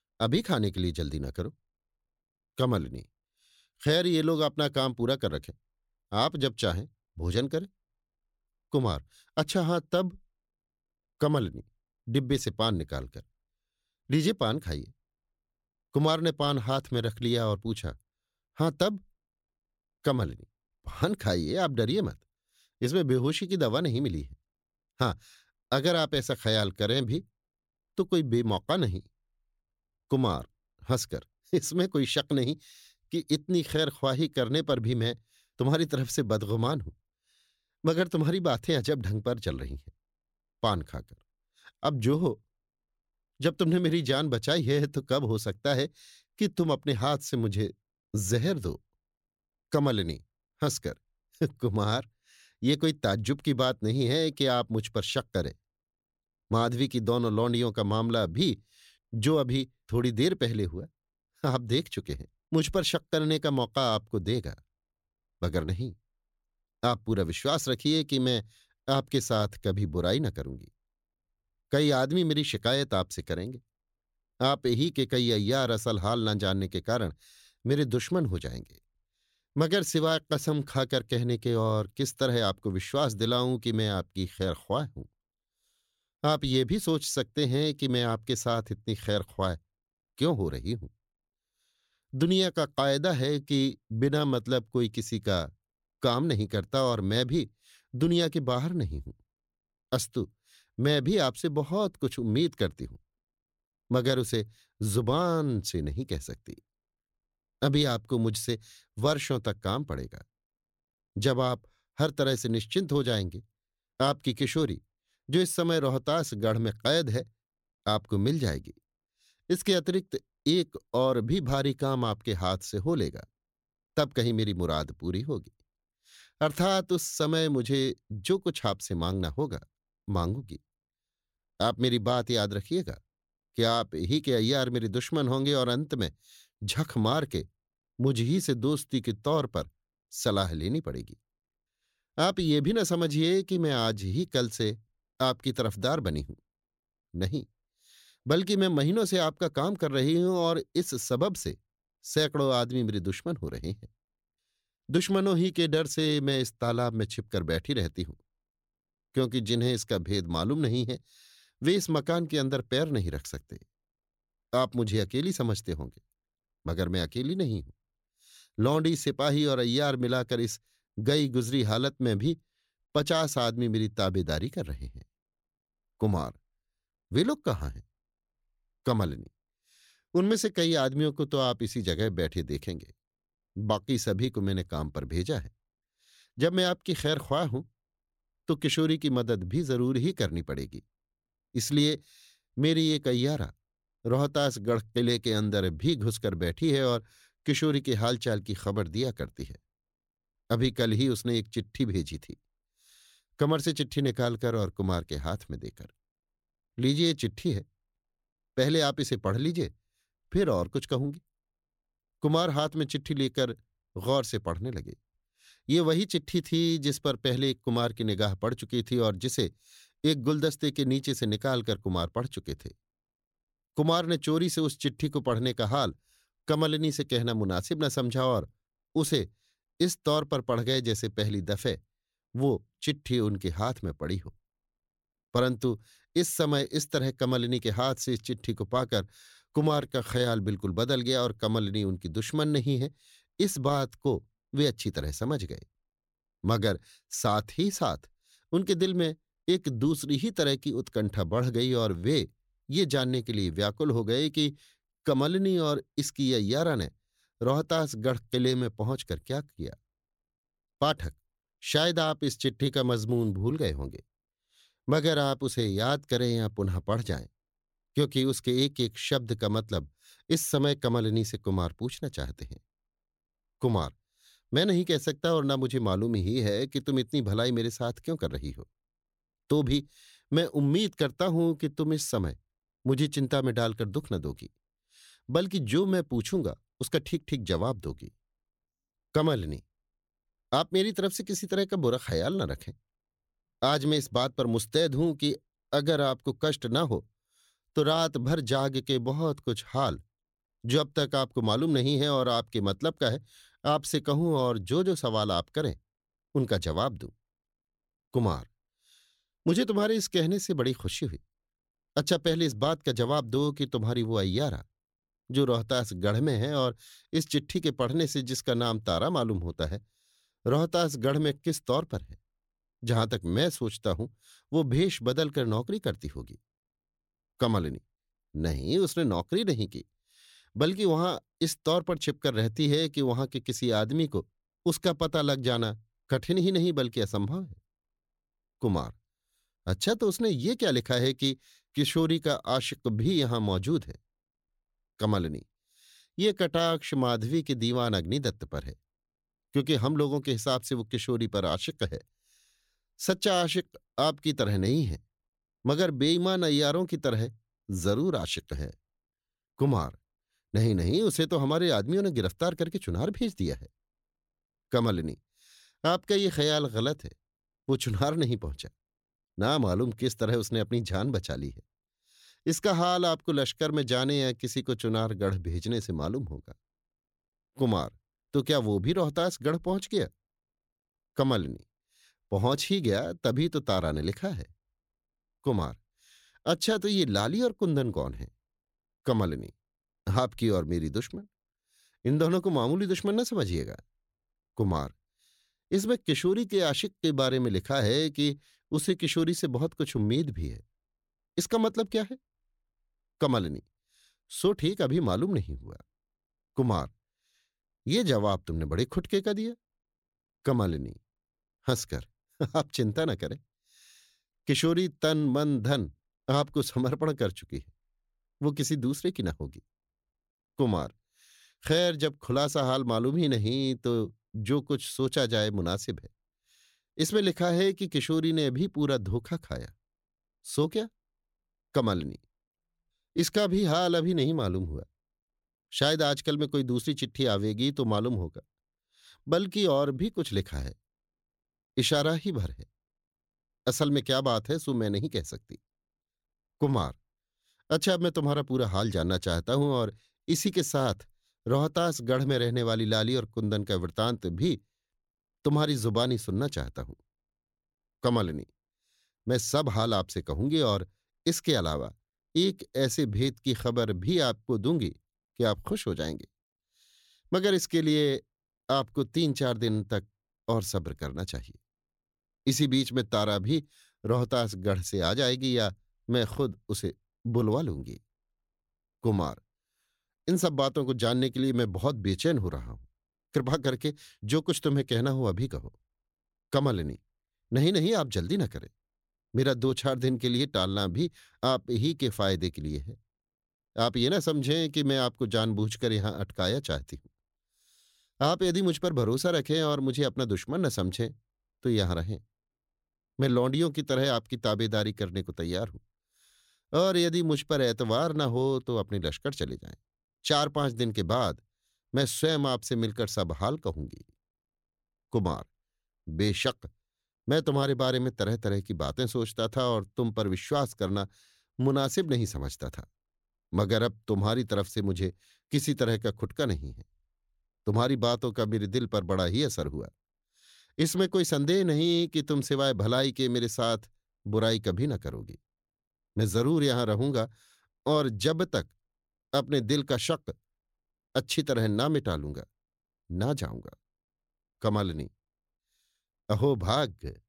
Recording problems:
none

